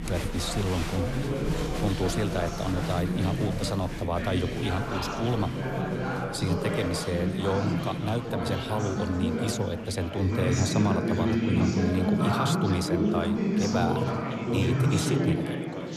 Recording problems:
chatter from many people; very loud; throughout; 2 dB above the speech

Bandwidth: 13.5 kHz